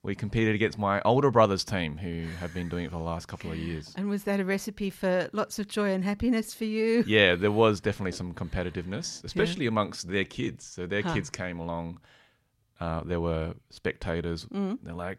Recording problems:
none

